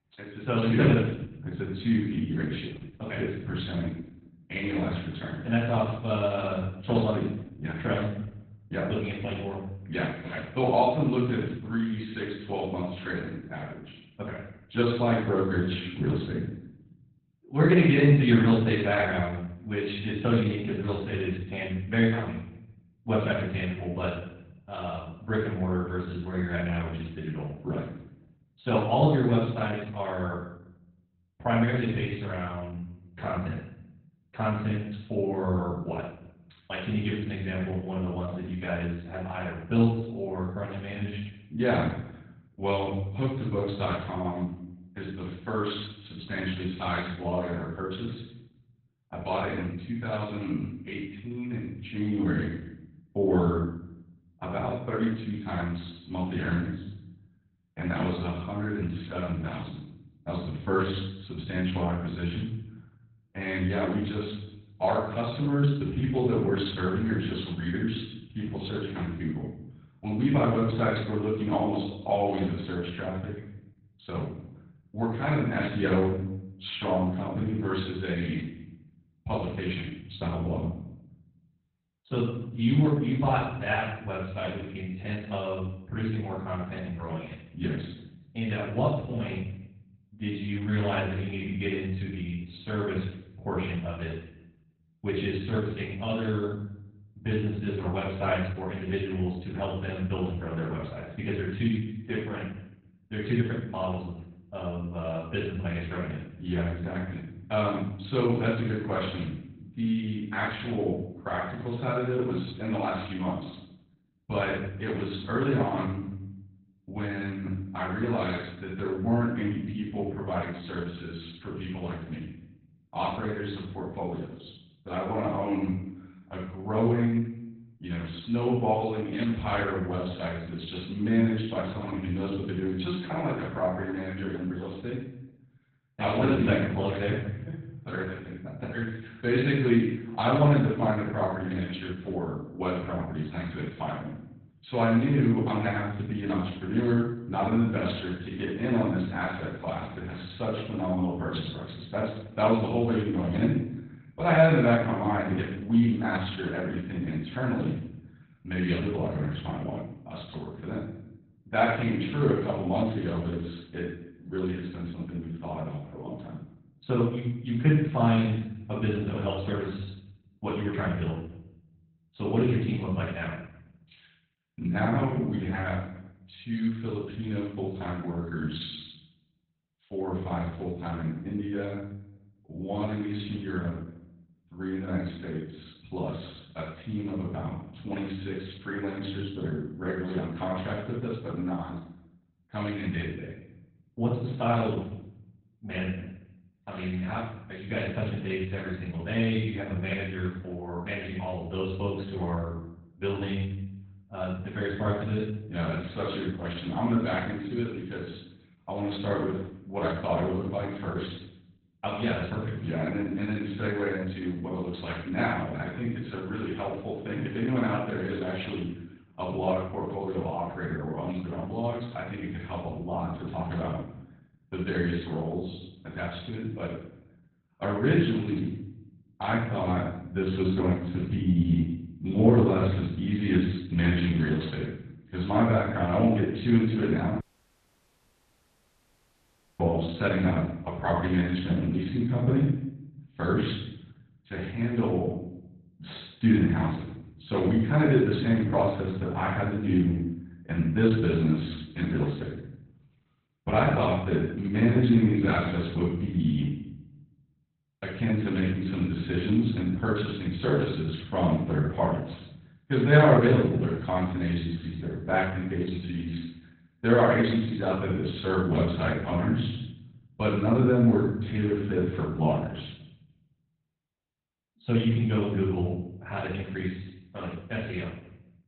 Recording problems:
off-mic speech; far
garbled, watery; badly; nothing above 4 kHz
room echo; noticeable; dies away in 0.7 s
audio cutting out; at 3:57 for 2.5 s

